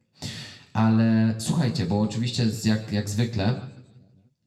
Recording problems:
room echo; slight; dies away in 0.7 s
off-mic speech; somewhat distant

